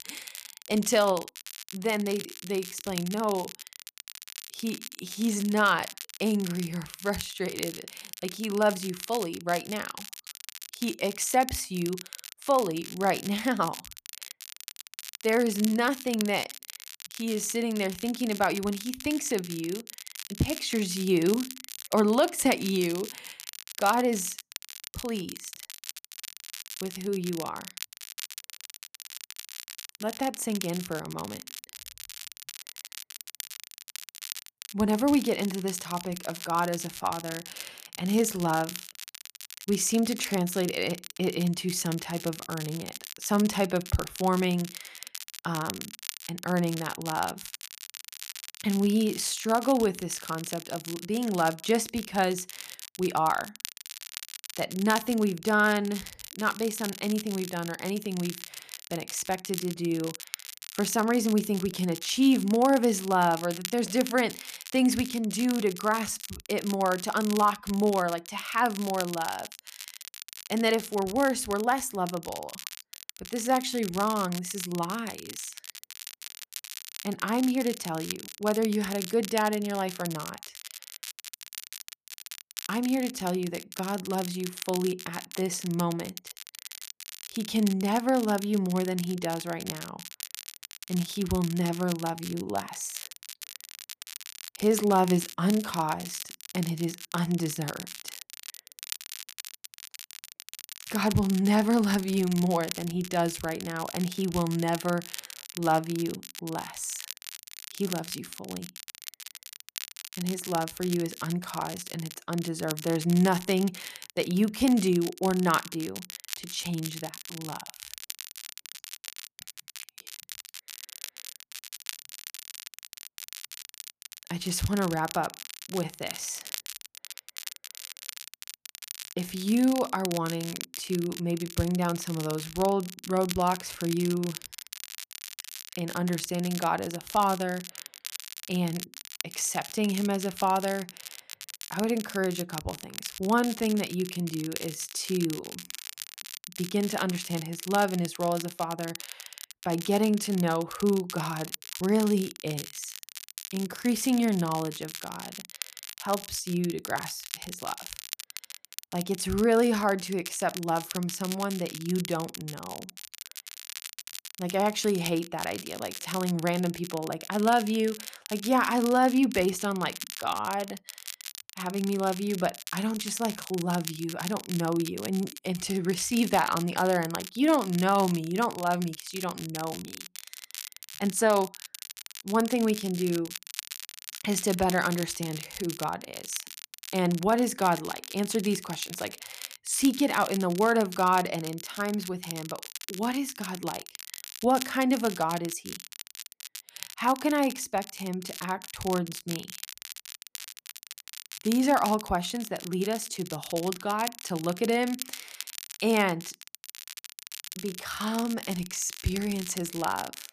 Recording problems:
crackle, like an old record; noticeable; 10 dB below the speech

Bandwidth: 14.5 kHz